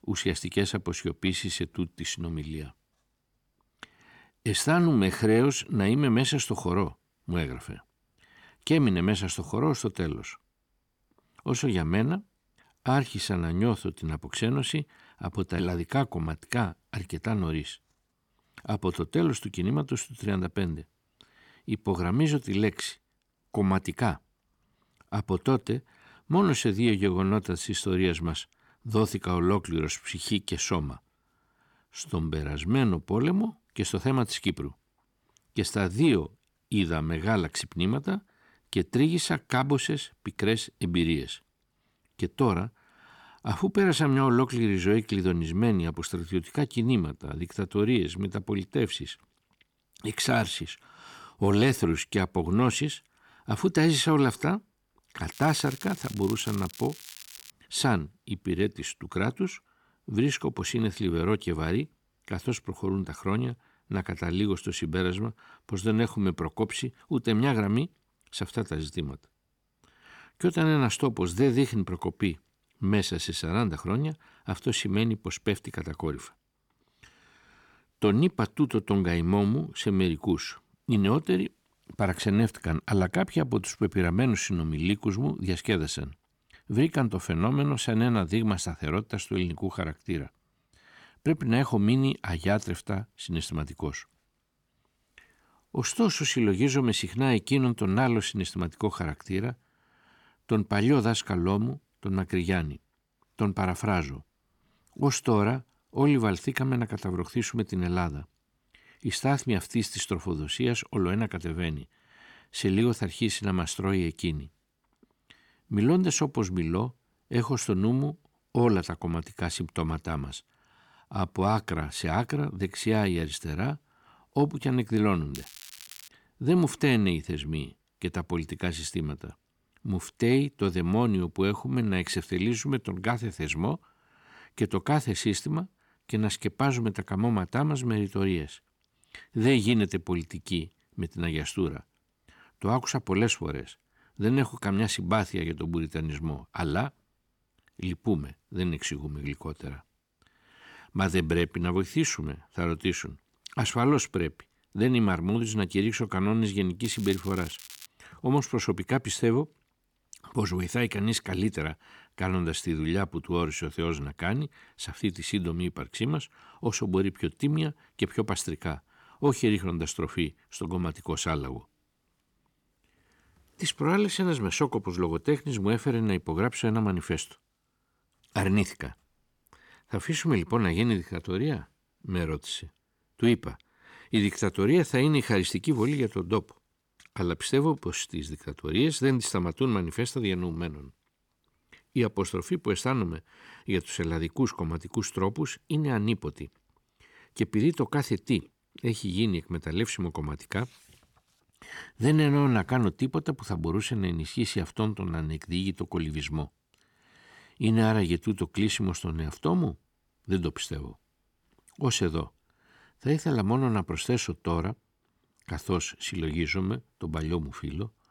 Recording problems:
crackling; noticeable; from 55 to 58 s, at 2:05 and from 2:37 to 2:38; 15 dB below the speech

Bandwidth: 18.5 kHz